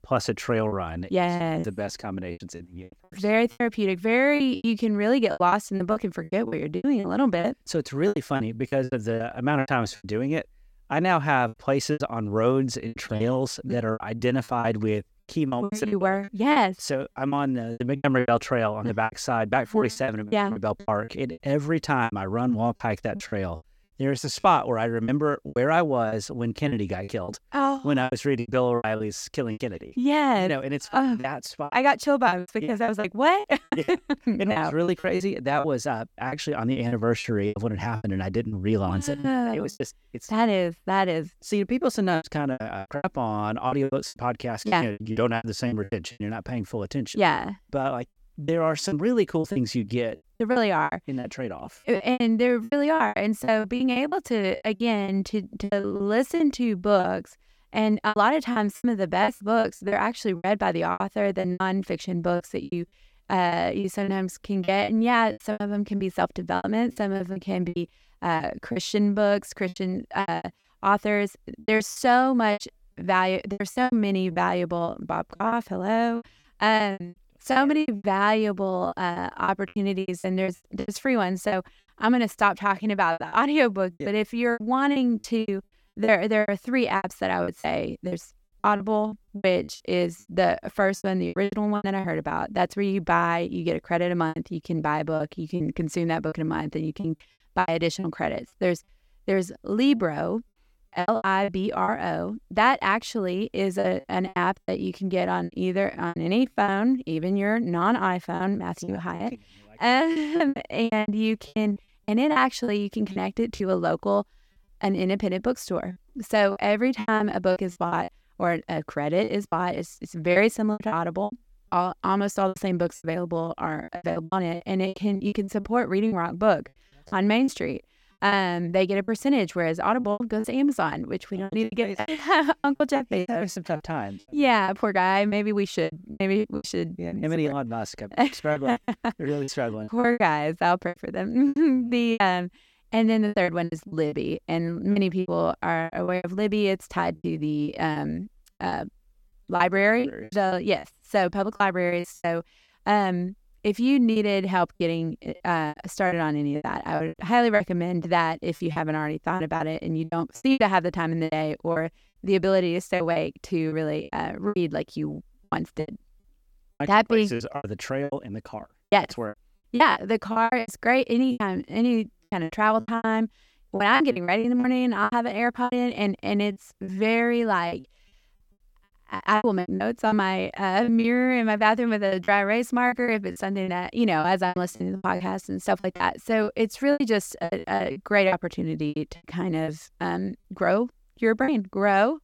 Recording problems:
choppy; very; 13% of the speech affected

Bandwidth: 17 kHz